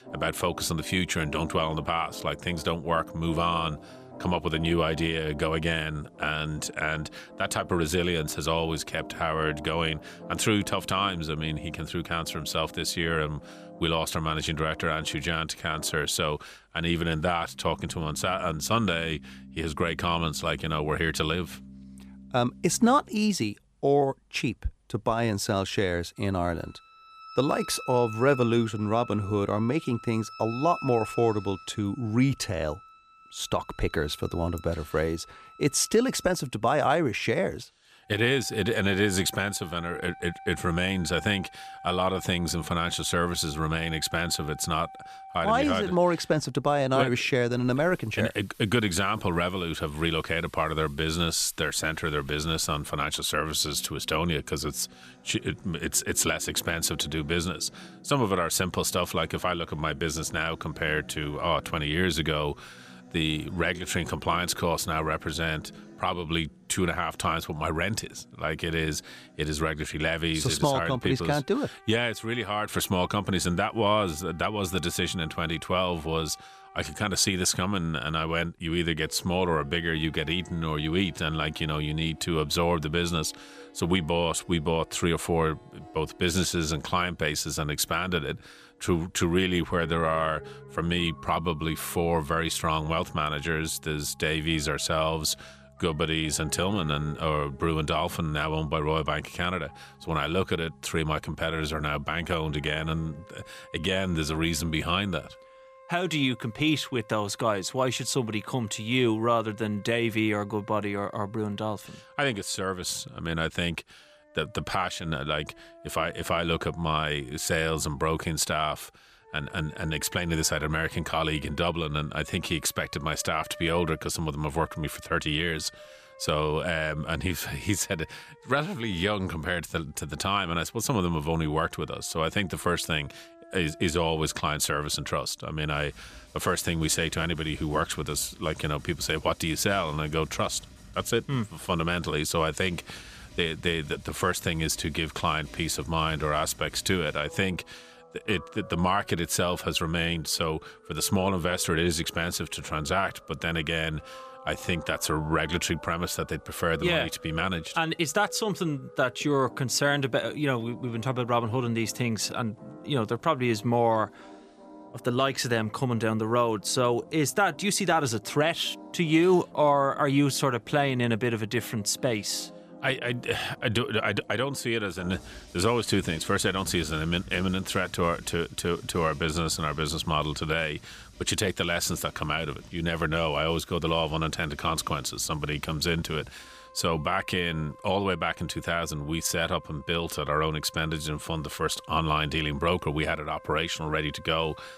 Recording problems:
background music; faint; throughout; 20 dB below the speech

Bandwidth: 14.5 kHz